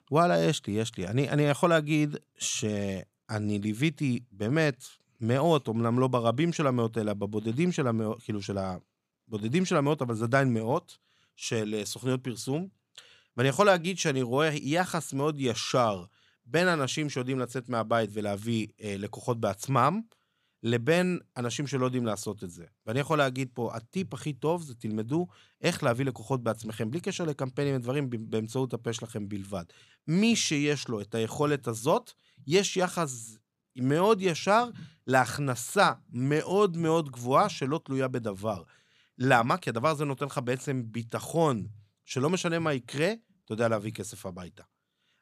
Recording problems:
none

